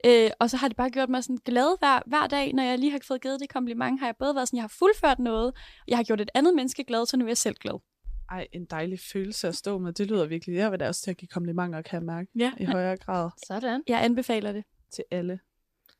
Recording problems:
none

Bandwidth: 14.5 kHz